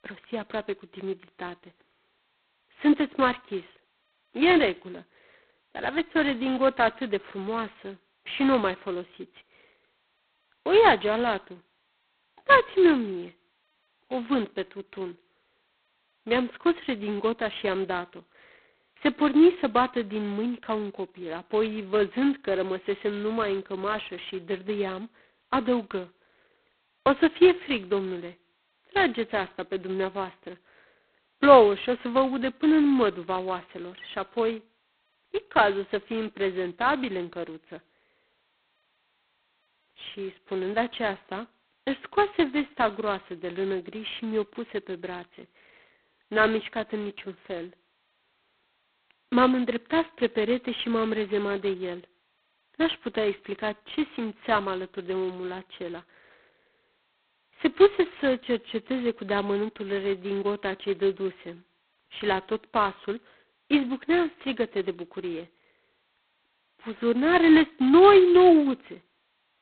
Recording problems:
phone-call audio; poor line; nothing above 4 kHz

